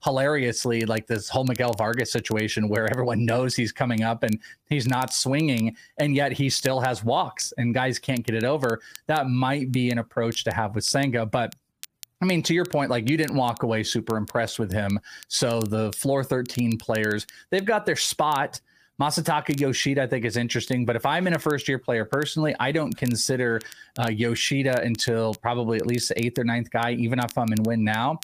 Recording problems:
squashed, flat; somewhat
crackle, like an old record; faint; 20 dB below the speech

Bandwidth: 15 kHz